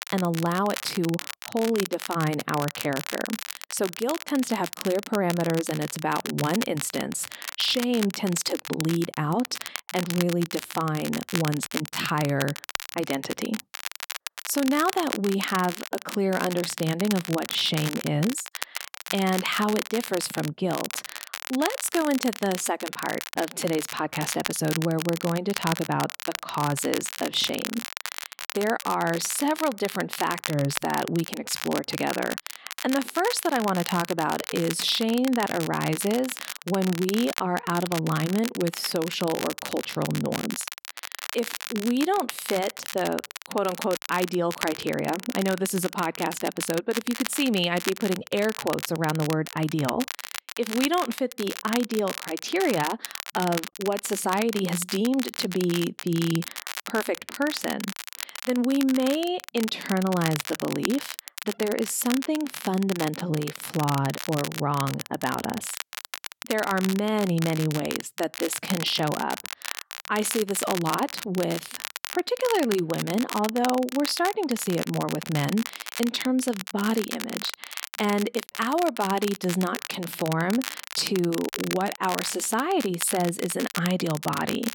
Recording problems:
crackle, like an old record; loud; 8 dB below the speech

